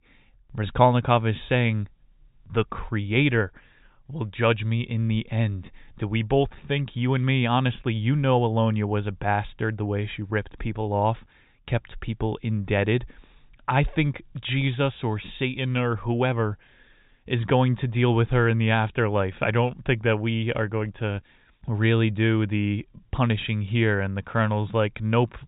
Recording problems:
high frequencies cut off; severe; nothing above 4 kHz

